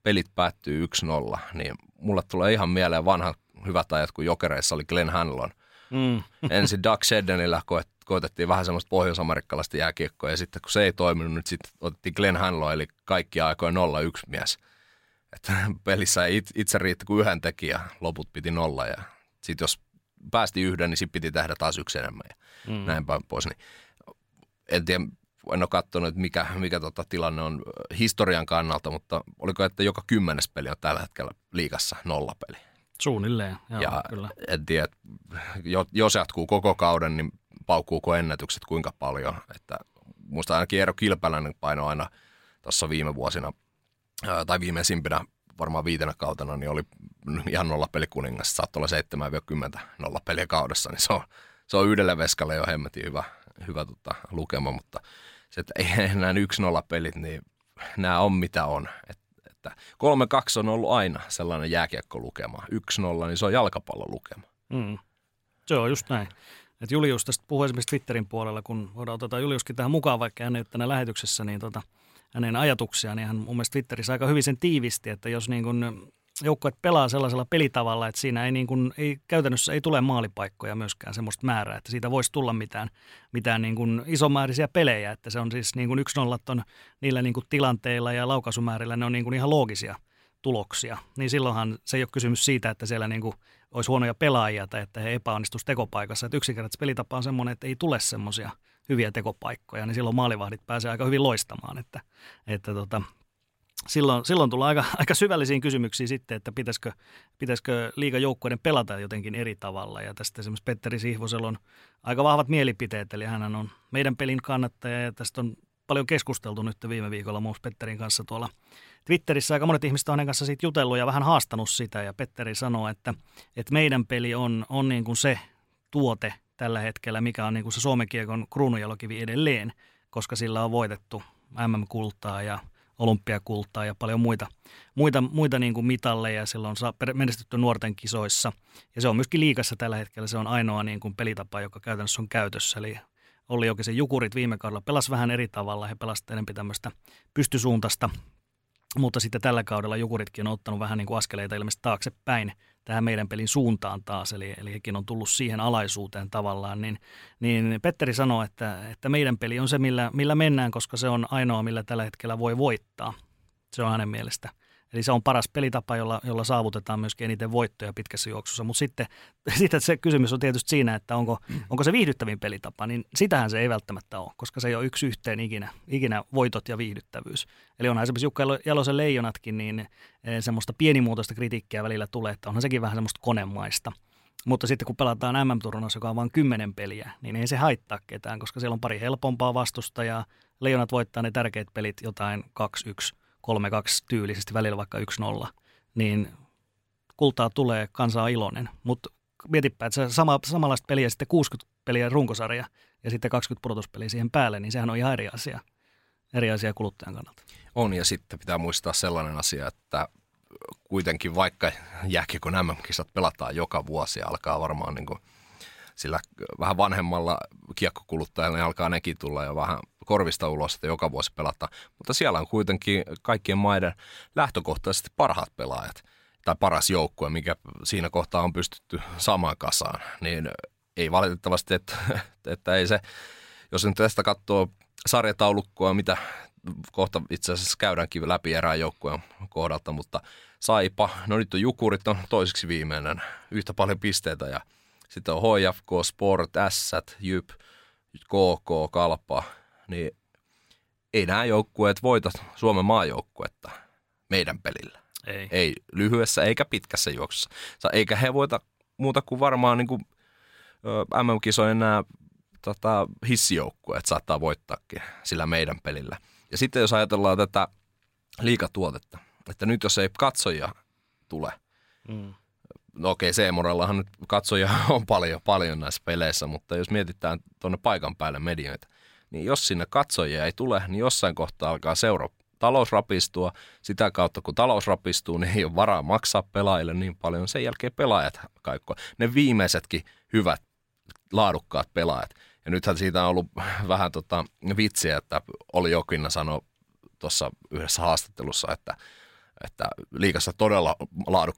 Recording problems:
none

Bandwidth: 16 kHz